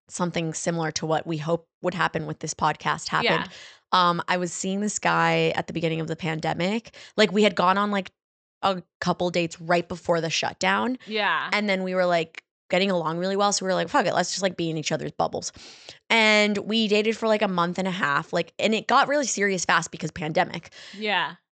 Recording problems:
high frequencies cut off; noticeable; nothing above 8 kHz

